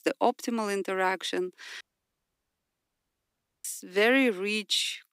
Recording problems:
thin; very slightly; fading below 300 Hz
audio cutting out; at 2 s for 2 s

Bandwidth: 15.5 kHz